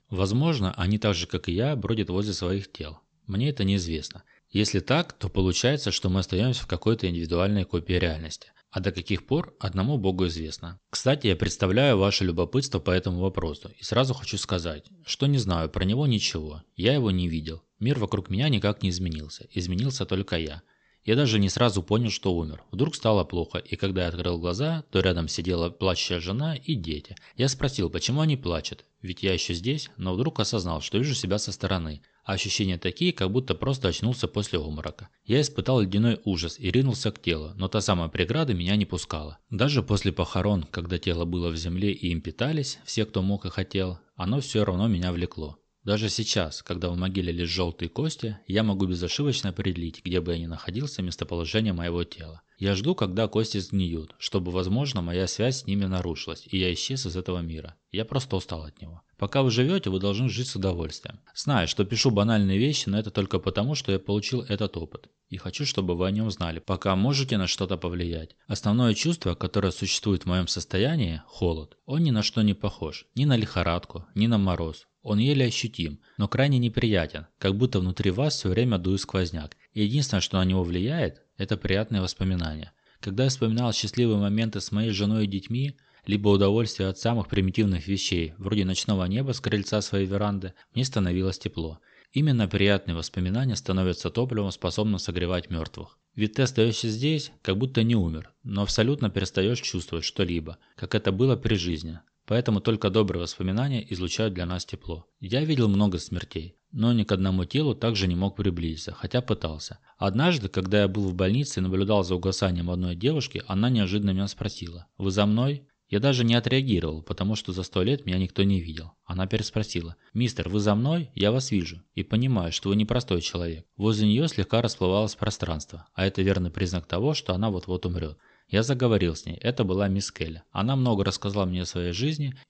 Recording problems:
high frequencies cut off; noticeable; nothing above 8 kHz

